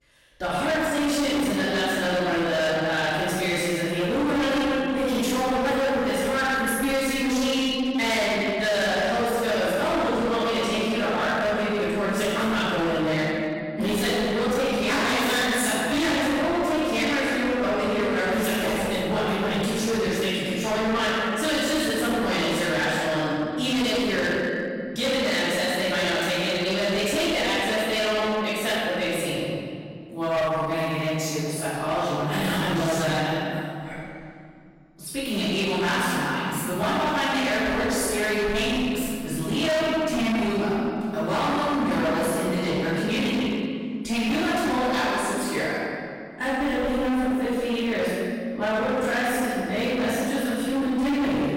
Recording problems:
distortion; heavy; 29% of the sound clipped
room echo; strong; dies away in 2.2 s
off-mic speech; far

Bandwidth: 16 kHz